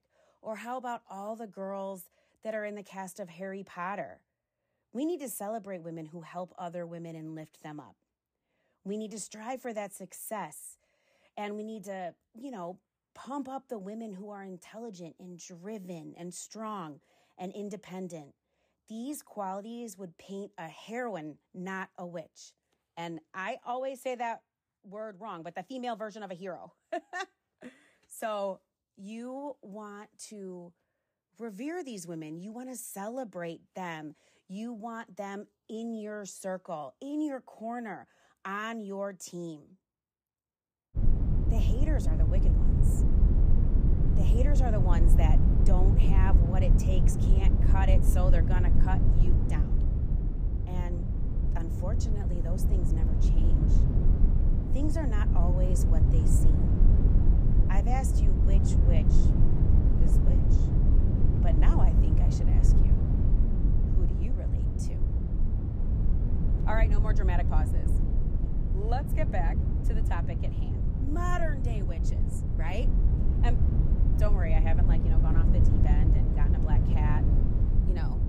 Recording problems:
low rumble; loud; from 41 s on; 2 dB below the speech

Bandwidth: 15 kHz